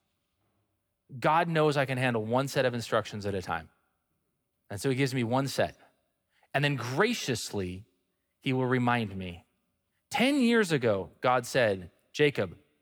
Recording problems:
none

